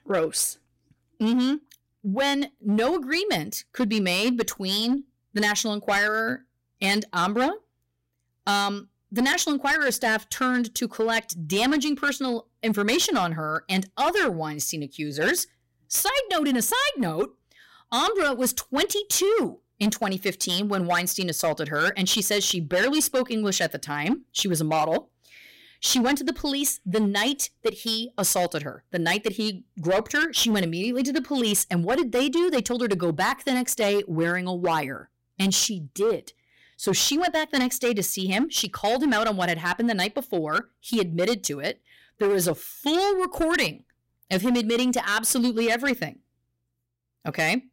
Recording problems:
distortion; slight; 9% of the sound clipped

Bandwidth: 16 kHz